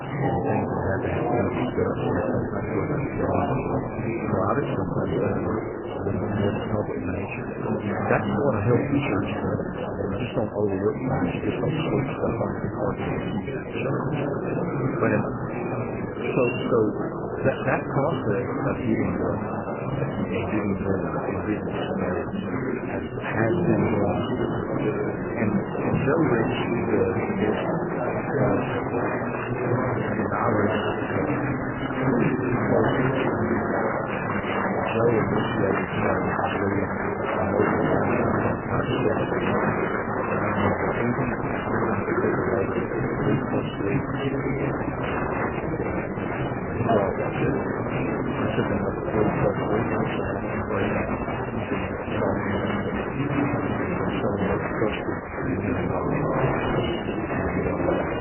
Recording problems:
garbled, watery; badly; nothing above 3 kHz
murmuring crowd; very loud; throughout; 2 dB above the speech
electrical hum; faint; throughout; 50 Hz, 25 dB below the speech

